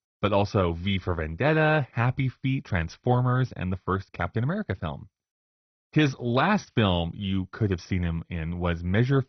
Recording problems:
garbled, watery; badly; nothing above 6 kHz

